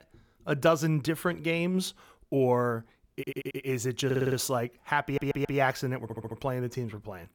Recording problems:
audio stuttering; 4 times, first at 3 s

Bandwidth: 18.5 kHz